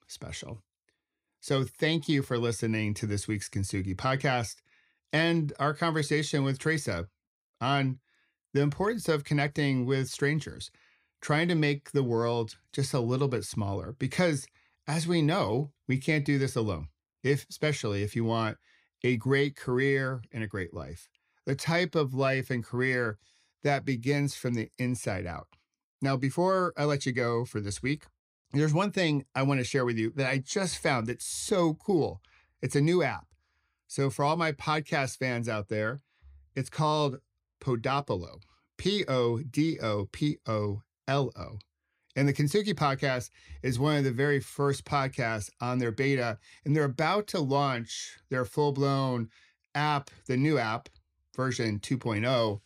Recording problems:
none

